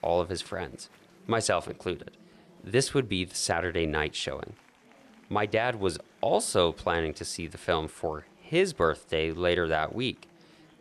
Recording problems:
murmuring crowd; faint; throughout; 30 dB below the speech

